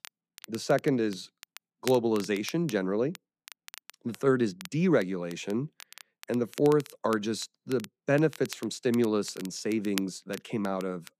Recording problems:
crackle, like an old record; noticeable; 15 dB below the speech

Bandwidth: 14.5 kHz